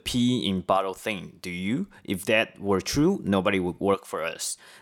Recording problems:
none

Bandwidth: 18 kHz